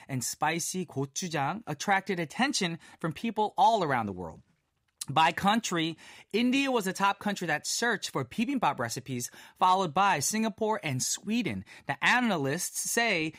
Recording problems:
none

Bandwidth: 15.5 kHz